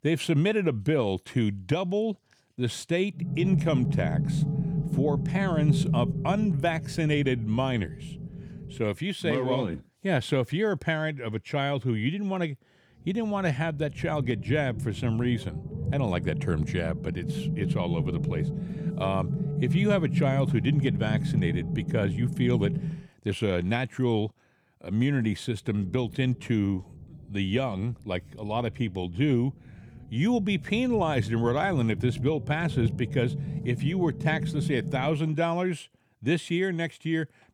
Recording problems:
low rumble; loud; from 3.5 to 9 s, from 13 to 23 s and from 26 to 35 s; 10 dB below the speech

